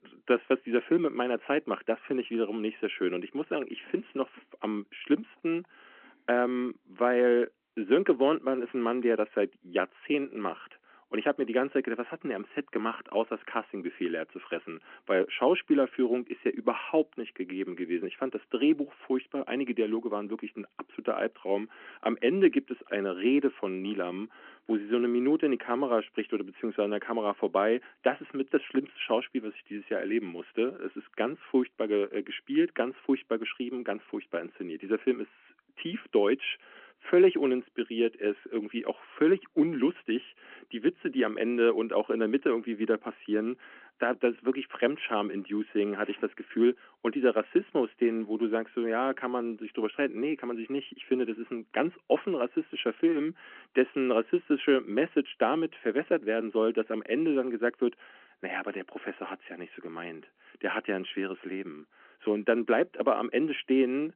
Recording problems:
phone-call audio

